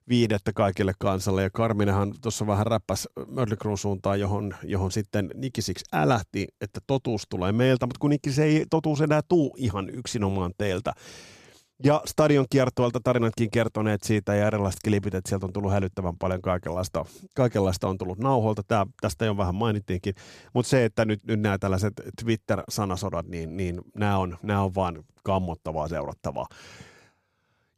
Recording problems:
none

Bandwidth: 14.5 kHz